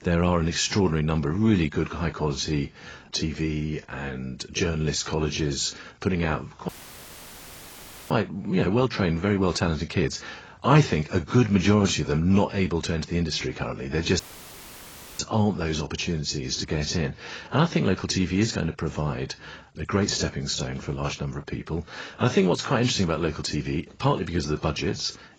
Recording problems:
garbled, watery; badly; nothing above 7.5 kHz
audio cutting out; filled with static; at 6.5 s for 1.5 s and at 14 s for 1 s

